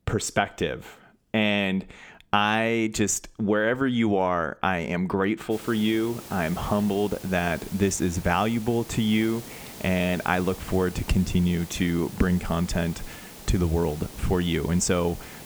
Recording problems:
hiss; noticeable; from 5.5 s on; 15 dB below the speech

